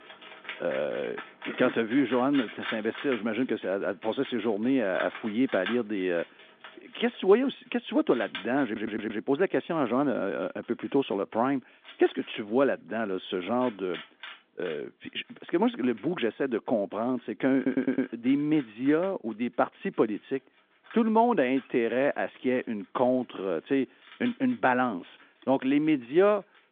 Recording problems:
phone-call audio; nothing above 3.5 kHz
animal sounds; noticeable; throughout; 15 dB below the speech
audio stuttering; at 8.5 s and at 18 s

